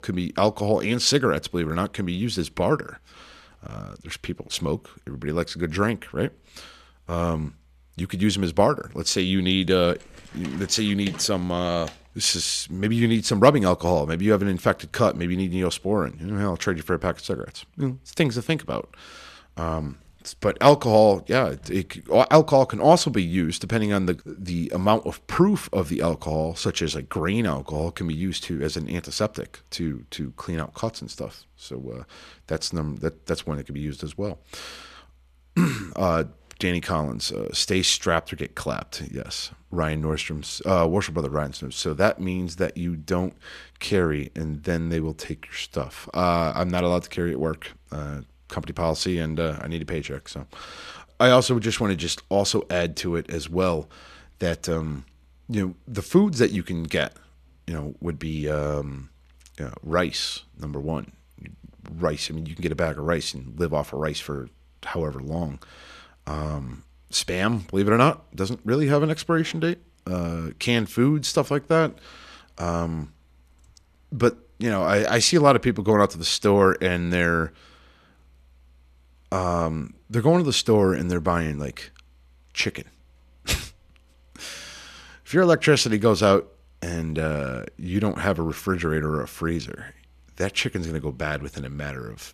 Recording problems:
none

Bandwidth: 14 kHz